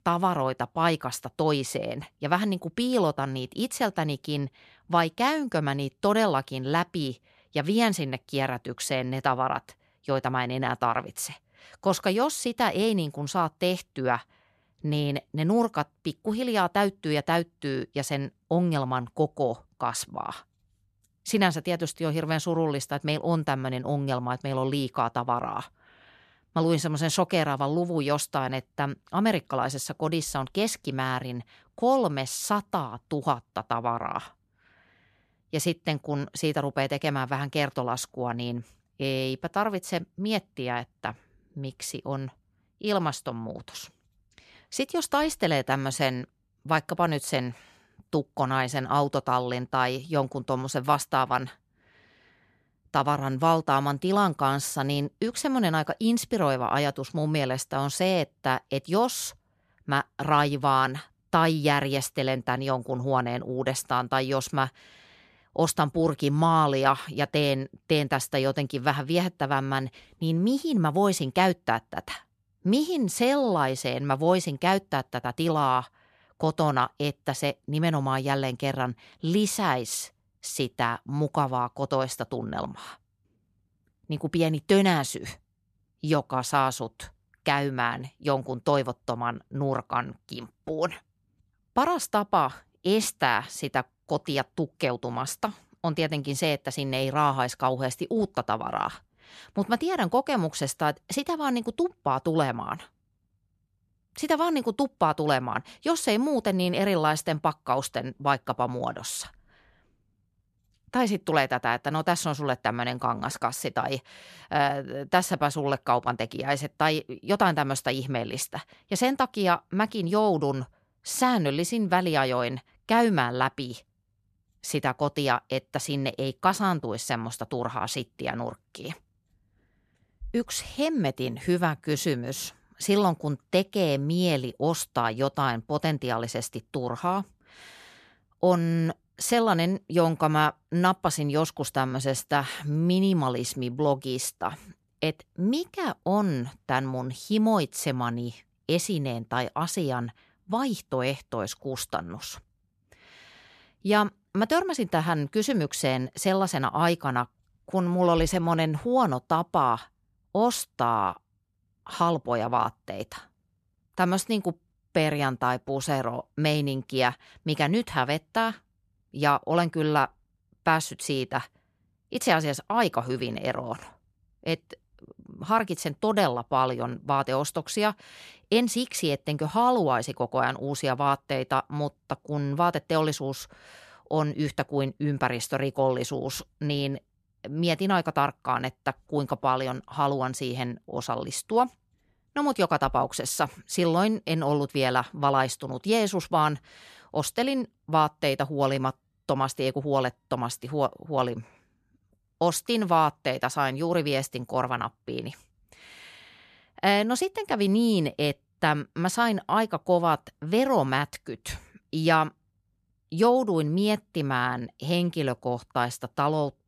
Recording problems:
none

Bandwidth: 14 kHz